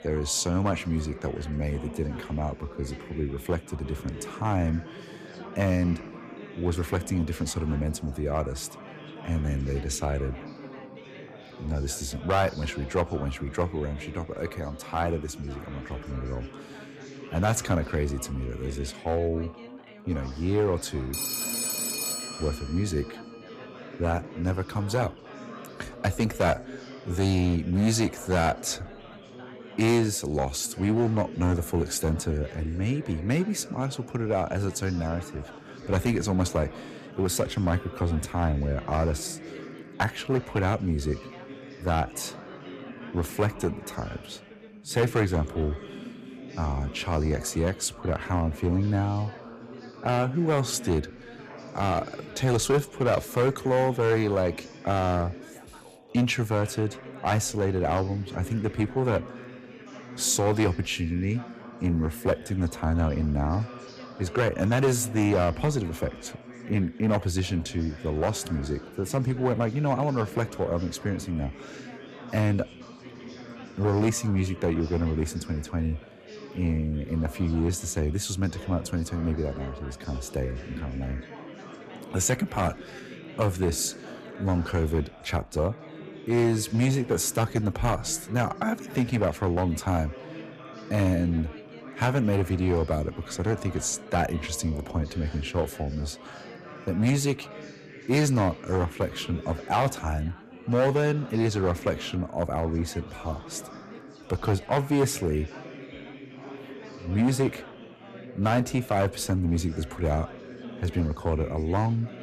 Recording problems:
distortion; slight; 3% of the sound clipped
background chatter; noticeable; throughout; 4 voices, 15 dB below the speech
phone ringing; loud; from 21 to 23 s; peak 1 dB above the speech

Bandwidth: 14.5 kHz